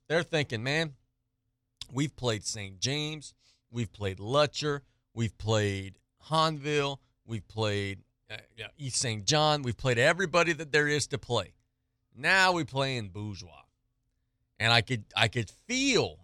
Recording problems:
none

